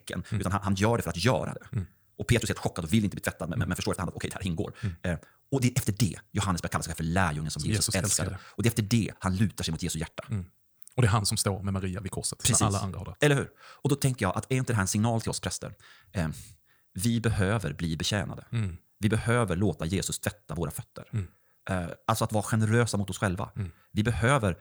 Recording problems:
wrong speed, natural pitch; too fast; 1.7 times normal speed

